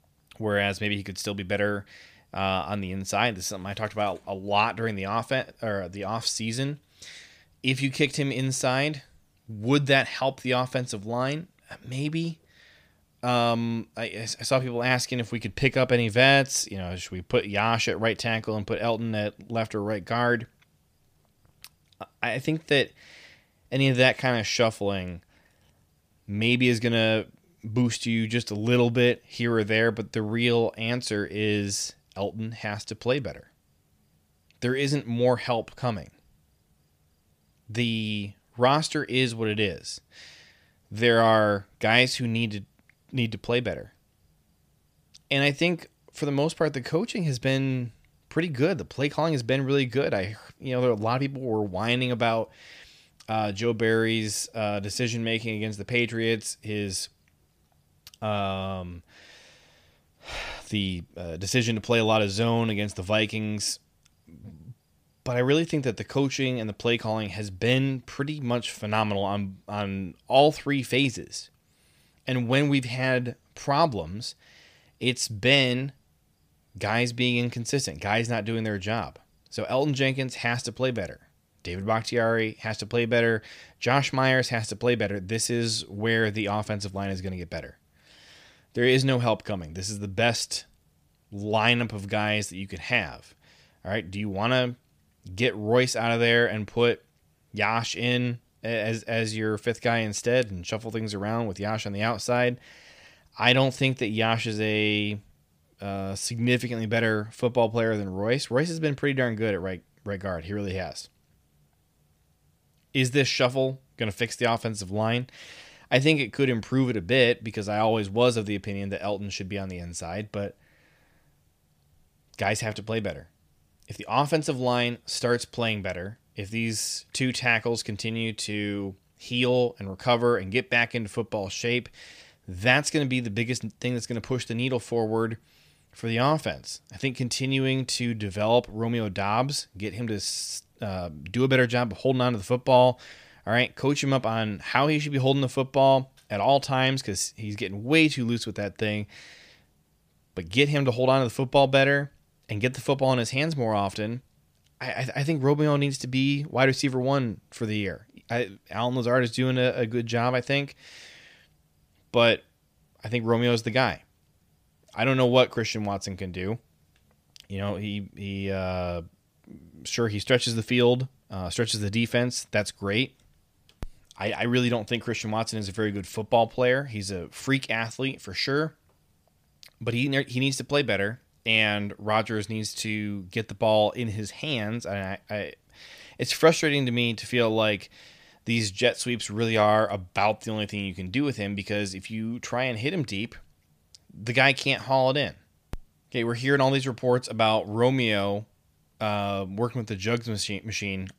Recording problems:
none

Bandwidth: 15 kHz